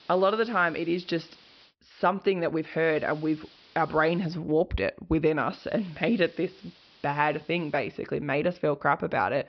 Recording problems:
high frequencies cut off; noticeable; nothing above 5.5 kHz
hiss; faint; until 1.5 s, from 3 to 4.5 s and from 5.5 to 8 s; 25 dB below the speech

